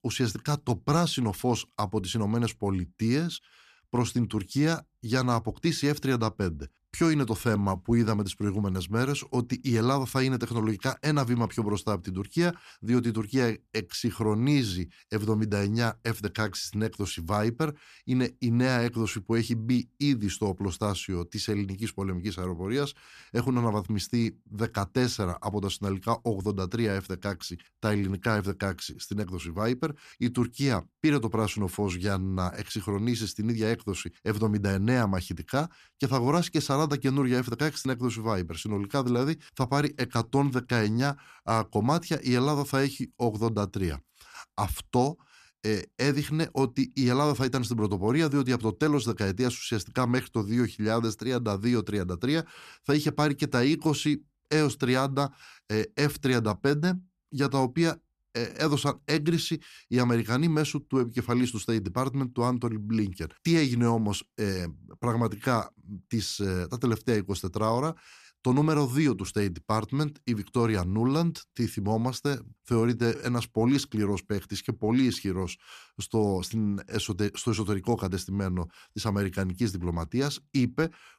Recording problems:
none

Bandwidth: 14.5 kHz